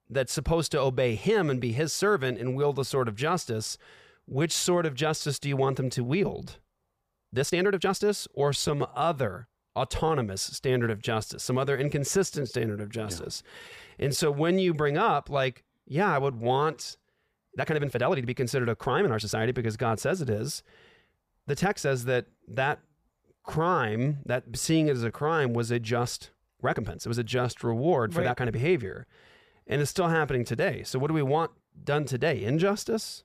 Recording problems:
uneven, jittery; strongly; from 2 to 30 s

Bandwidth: 15 kHz